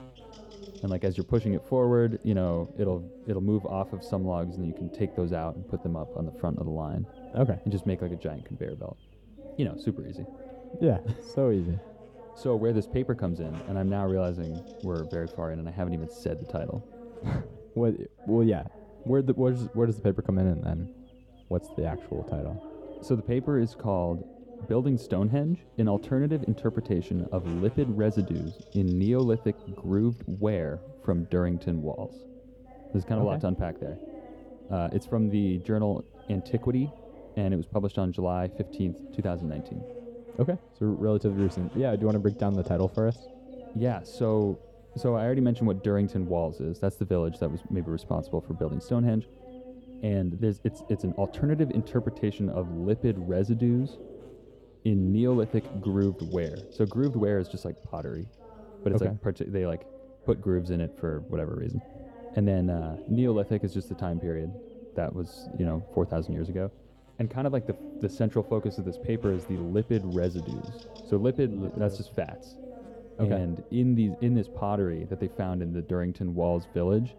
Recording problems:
muffled; very; fading above 1 kHz
background chatter; noticeable; throughout; 2 voices, 15 dB below the speech
electrical hum; faint; throughout; 50 Hz, 25 dB below the speech

